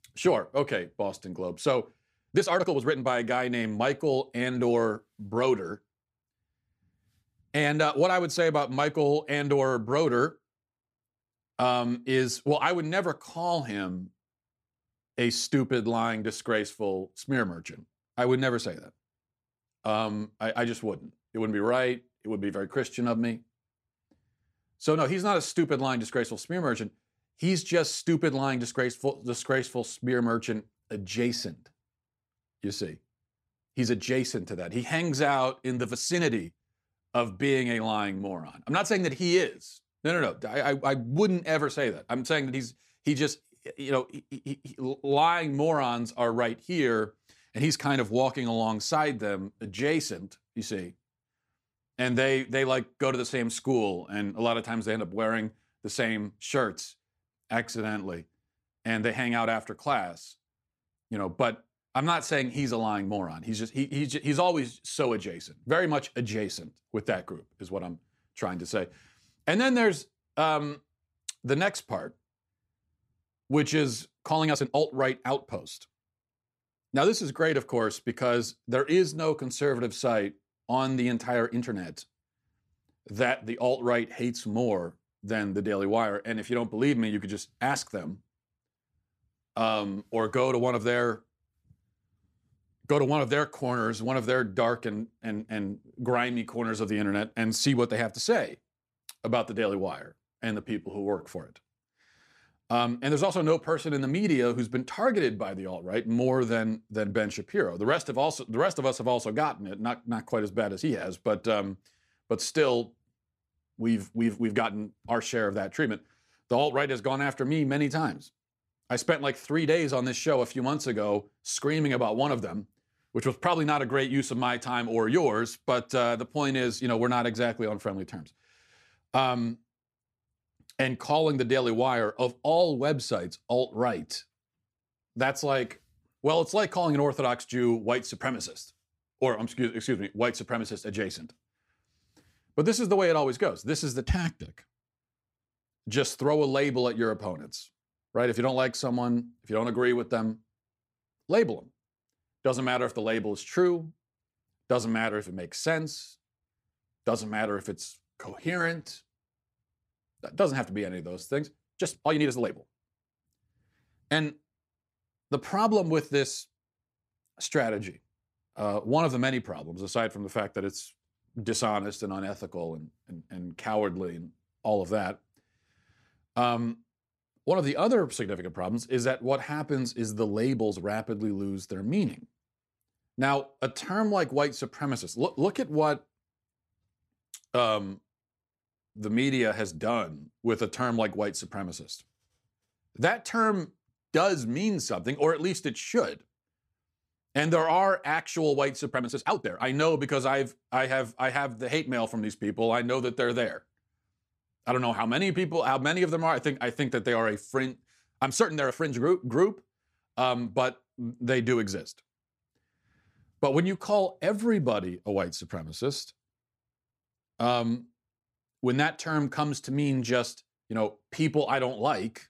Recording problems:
uneven, jittery; strongly; from 2.5 s to 3:29

